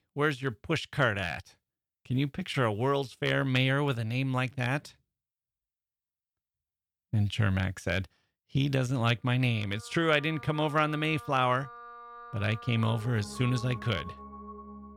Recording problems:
background music; noticeable; from 9.5 s on; 15 dB below the speech

